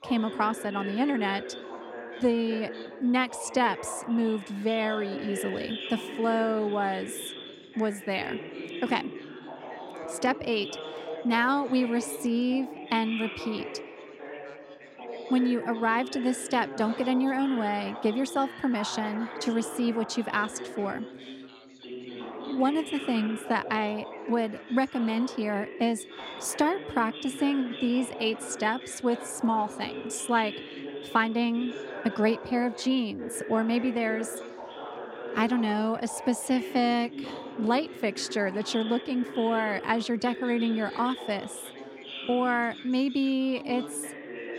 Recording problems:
background chatter; noticeable; throughout; 3 voices, 10 dB below the speech

